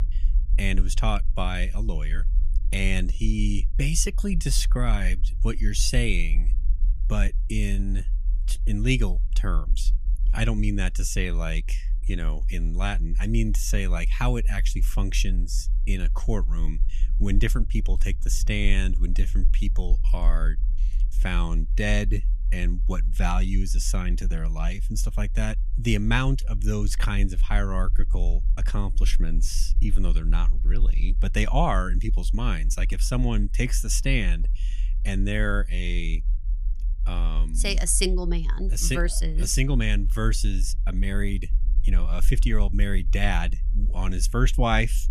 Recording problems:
low rumble; faint; throughout; 20 dB below the speech

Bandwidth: 14.5 kHz